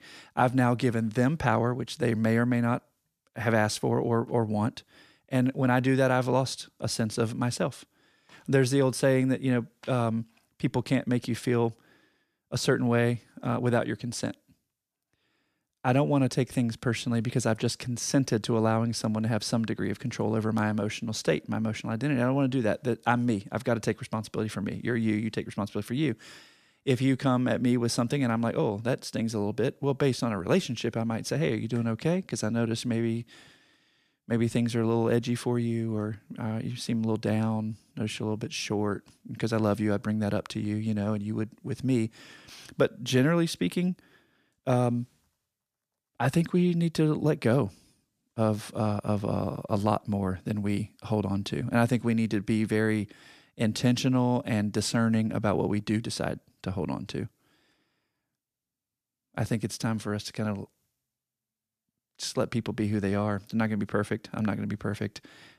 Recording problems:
none

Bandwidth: 14.5 kHz